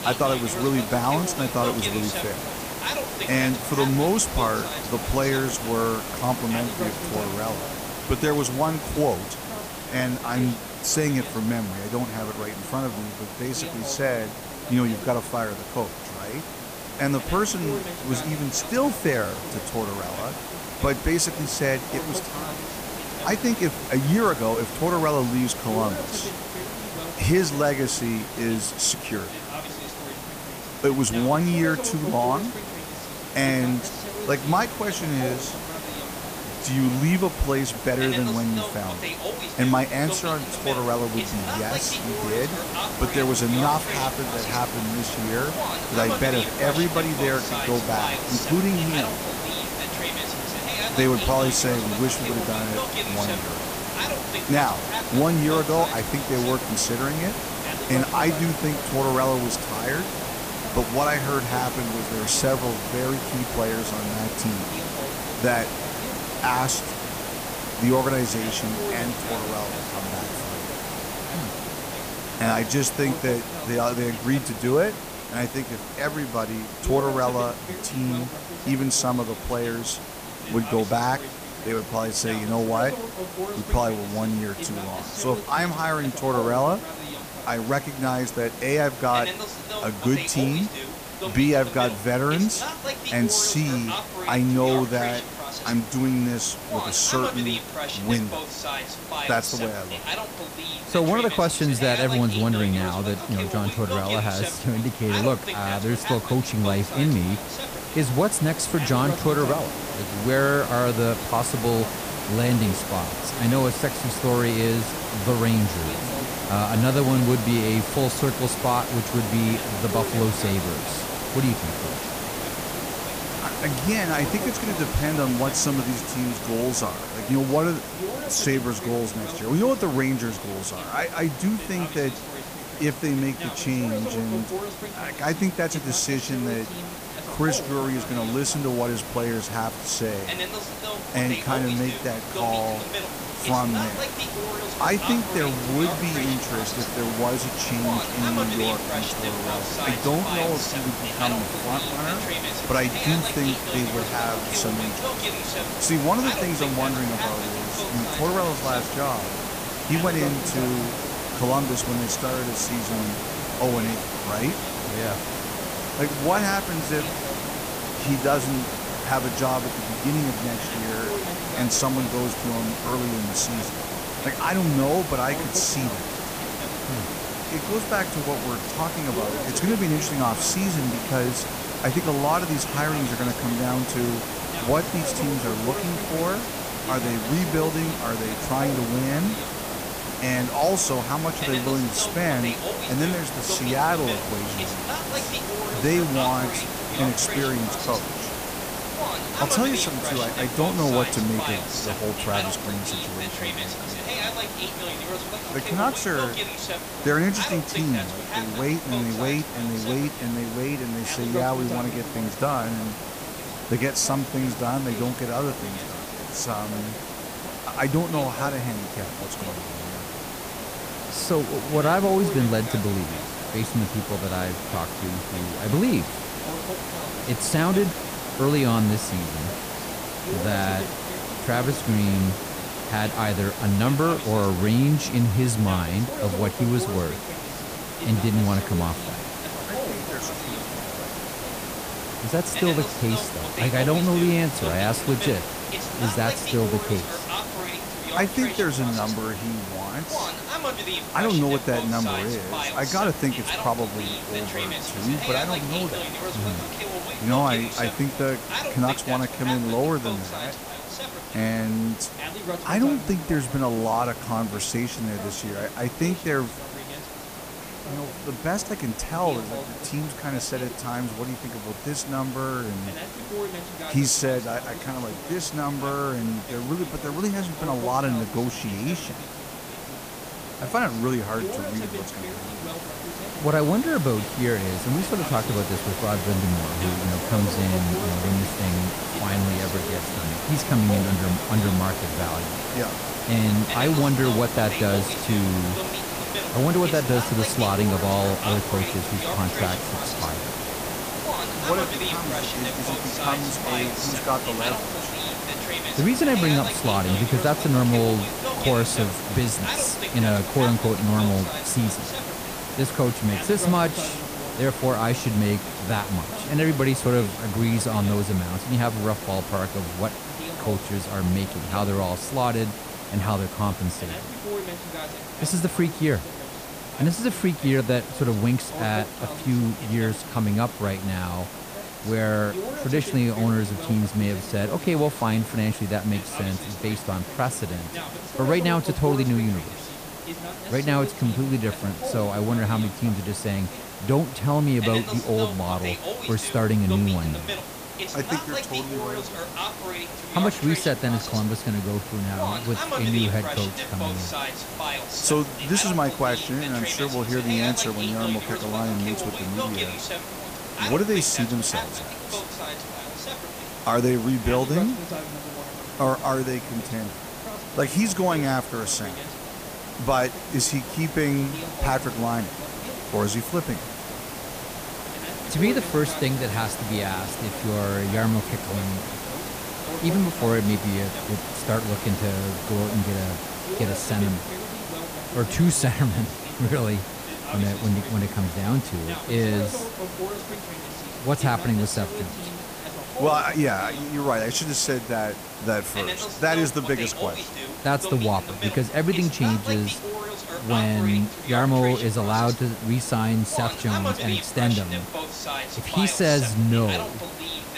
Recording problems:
voice in the background; loud; throughout; 9 dB below the speech
hiss; loud; throughout; 6 dB below the speech

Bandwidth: 15 kHz